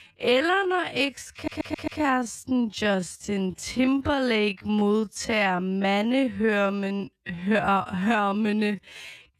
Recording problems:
wrong speed, natural pitch; too slow; 0.5 times normal speed
audio stuttering; at 1.5 s

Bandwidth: 14 kHz